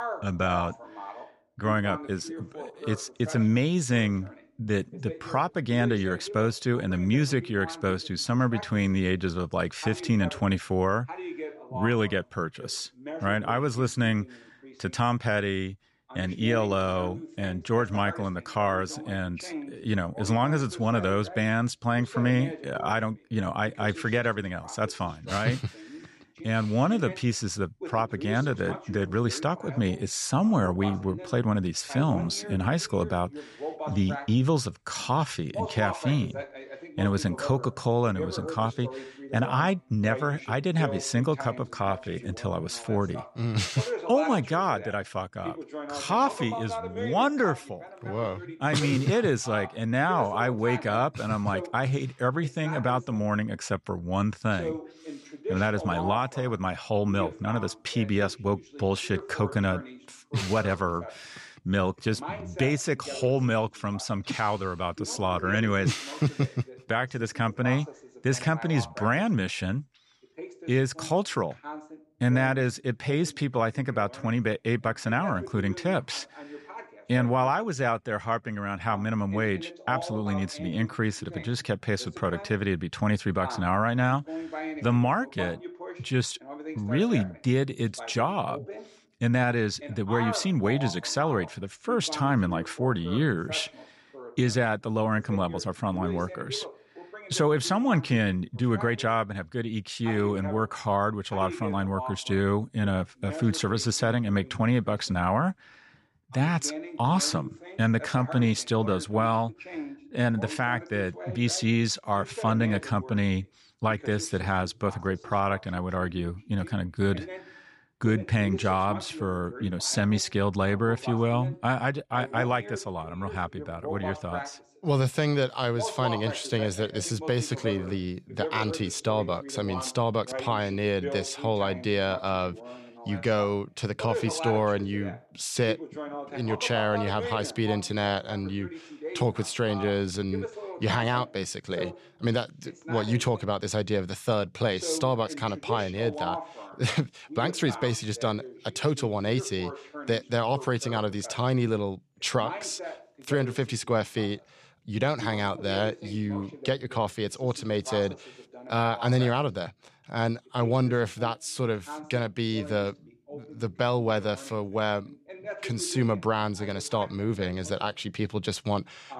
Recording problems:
voice in the background; noticeable; throughout; 10 dB below the speech

